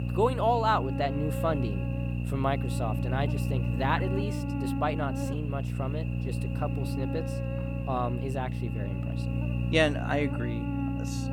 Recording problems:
electrical hum; loud; throughout; 60 Hz, 9 dB below the speech

